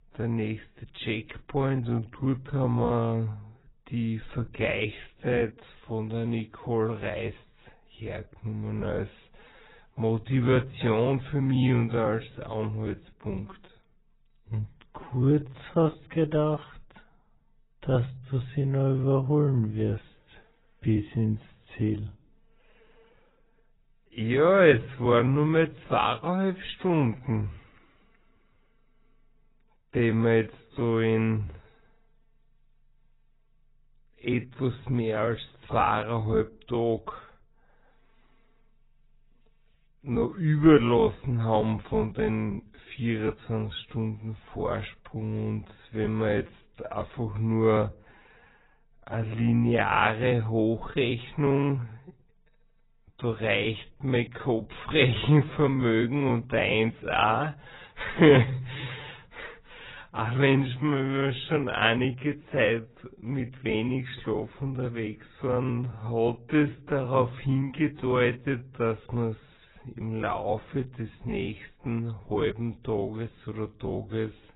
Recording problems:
garbled, watery; badly; nothing above 4 kHz
wrong speed, natural pitch; too slow; 0.5 times normal speed

